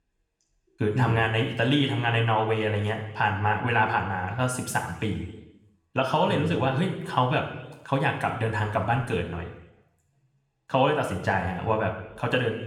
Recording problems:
room echo; slight; dies away in 0.9 s
off-mic speech; somewhat distant

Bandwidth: 17.5 kHz